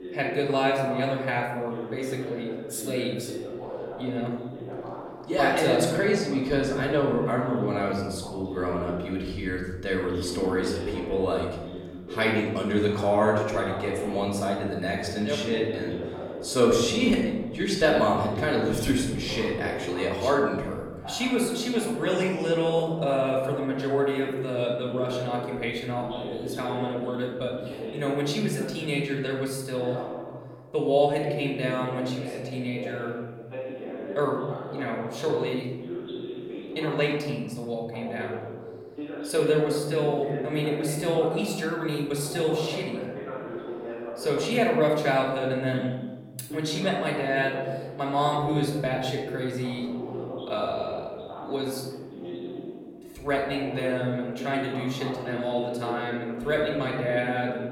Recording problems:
off-mic speech; far
room echo; noticeable; dies away in 1.2 s
voice in the background; loud; throughout; 10 dB below the speech

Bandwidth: 16.5 kHz